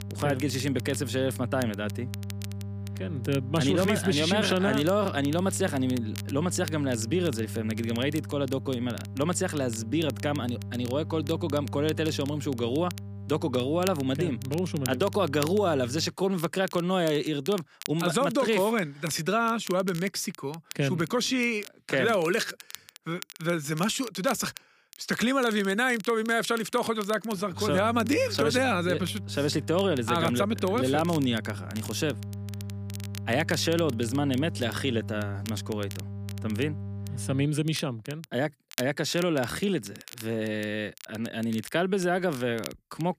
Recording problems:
electrical hum; noticeable; until 16 s and from 28 to 37 s; 50 Hz, 20 dB below the speech
crackle, like an old record; noticeable; 15 dB below the speech

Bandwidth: 15 kHz